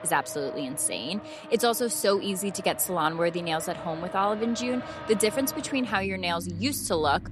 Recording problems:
traffic noise; noticeable; throughout; 15 dB below the speech

